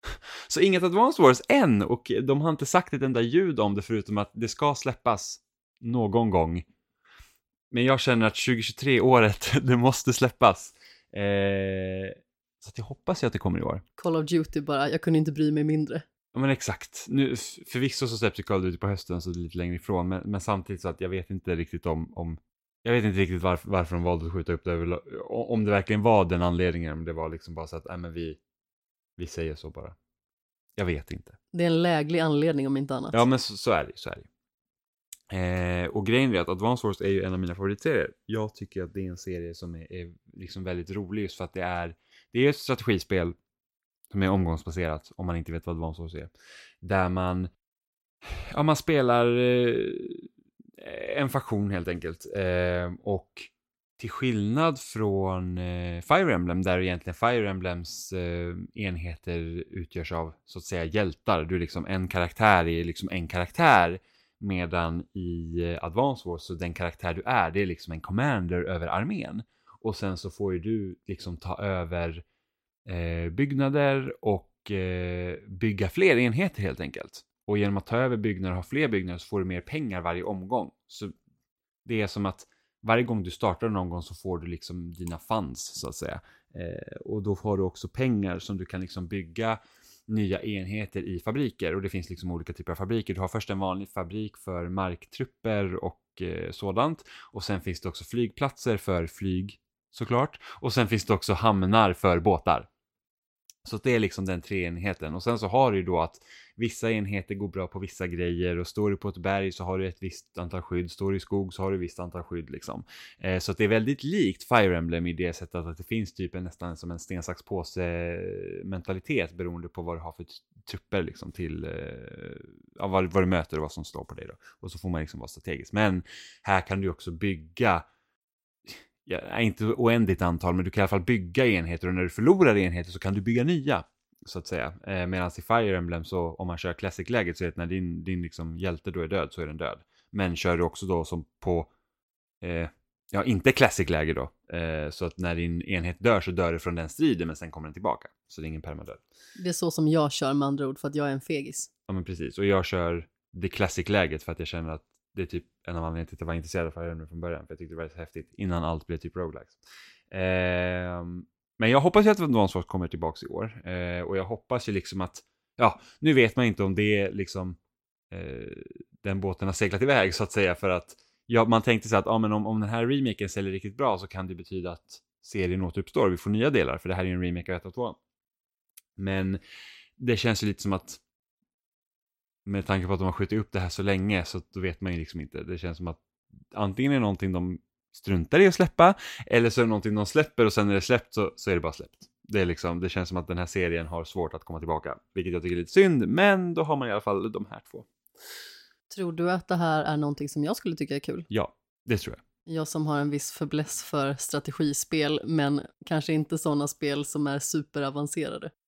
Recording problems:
none

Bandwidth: 16 kHz